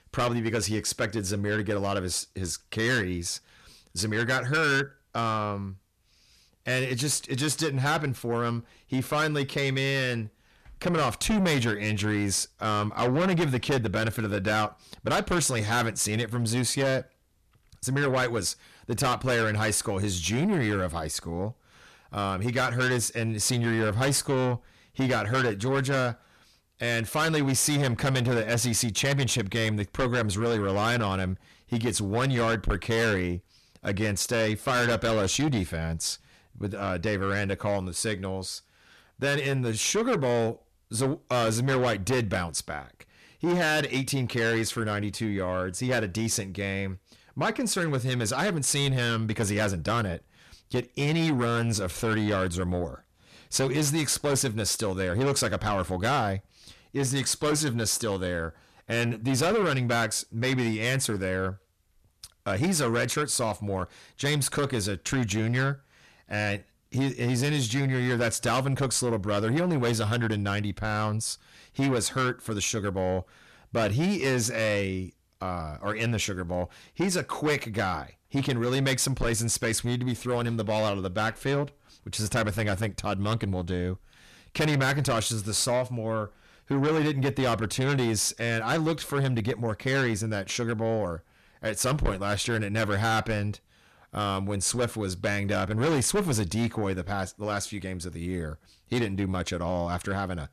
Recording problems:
distortion; heavy; 6 dB below the speech

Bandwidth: 14 kHz